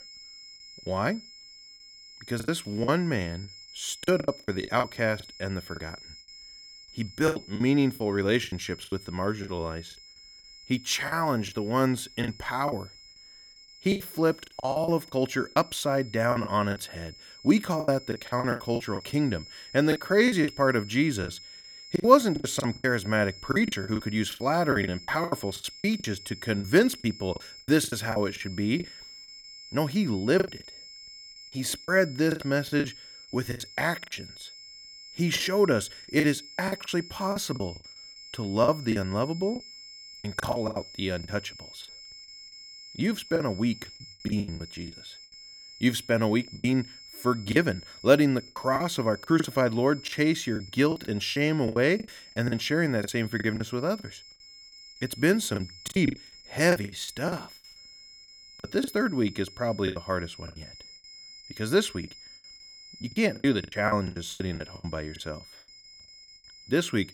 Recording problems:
high-pitched whine; noticeable; throughout; 5 kHz, 20 dB below the speech
choppy; very; 14% of the speech affected

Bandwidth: 17.5 kHz